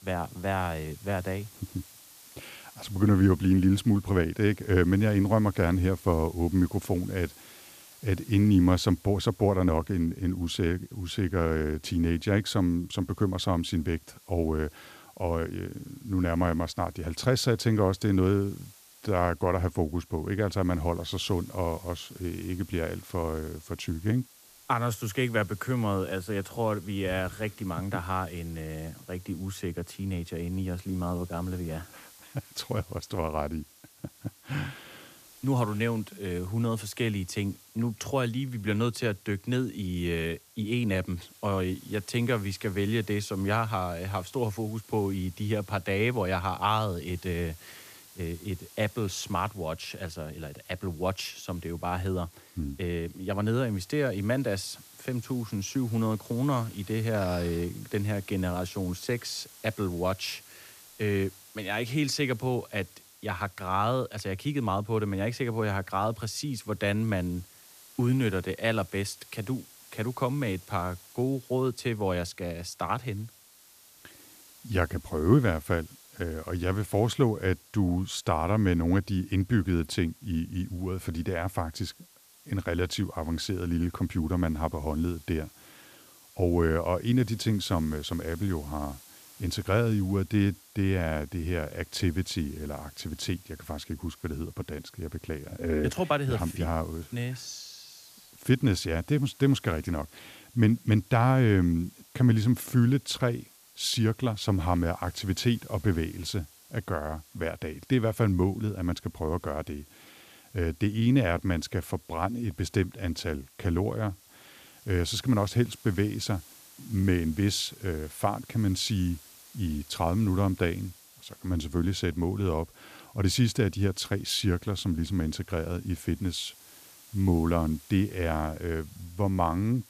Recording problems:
hiss; faint; throughout; 20 dB below the speech

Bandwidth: 14.5 kHz